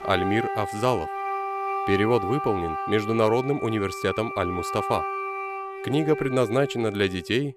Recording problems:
background music; loud; throughout; 6 dB below the speech

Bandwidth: 14.5 kHz